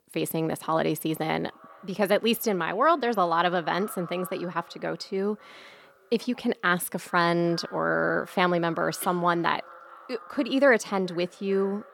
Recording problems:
echo of what is said; faint; throughout; 410 ms later, 20 dB below the speech

